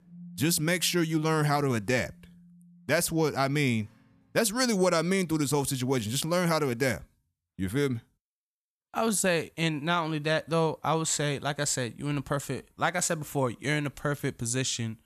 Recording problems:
background music; faint; until 4 s; 25 dB below the speech

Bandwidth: 14.5 kHz